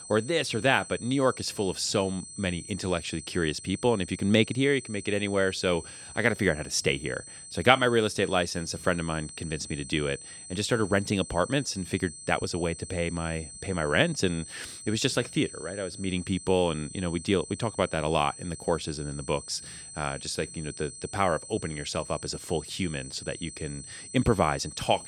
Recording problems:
high-pitched whine; noticeable; throughout; 8 kHz, 15 dB below the speech

